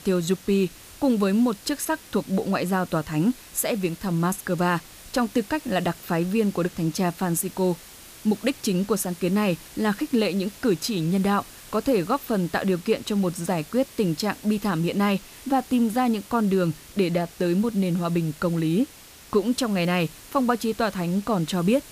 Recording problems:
hiss; noticeable; throughout; 20 dB below the speech

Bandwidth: 15 kHz